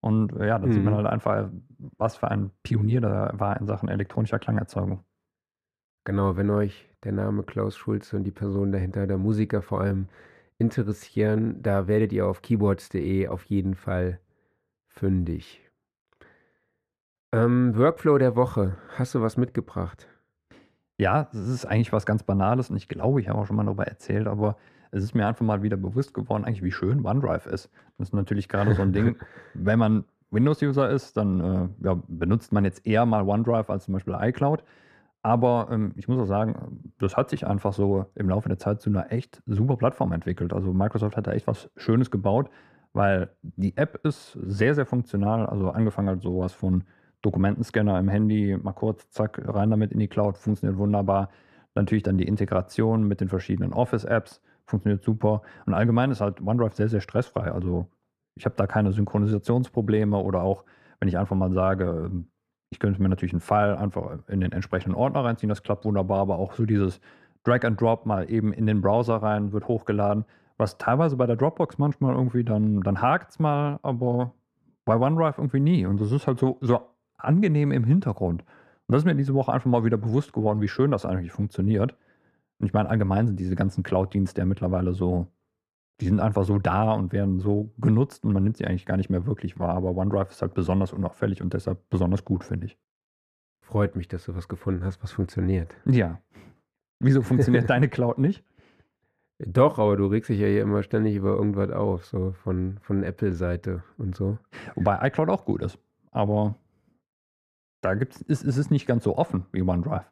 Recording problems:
muffled; slightly; fading above 2.5 kHz

